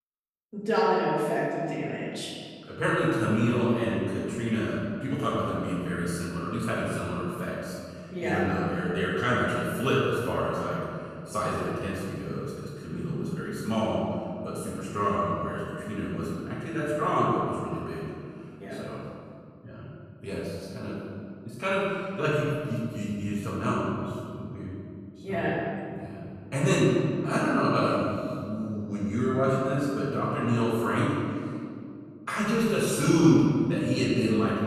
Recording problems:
room echo; strong; dies away in 2.2 s
off-mic speech; far

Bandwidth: 13.5 kHz